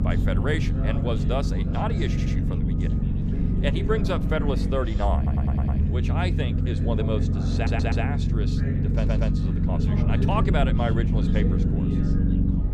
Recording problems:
background chatter; loud; throughout; 2 voices, 6 dB below the speech
low rumble; loud; throughout; 4 dB below the speech
electrical hum; noticeable; throughout; 60 Hz, 15 dB below the speech
audio stuttering; 4 times, first at 2 s

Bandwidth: 14.5 kHz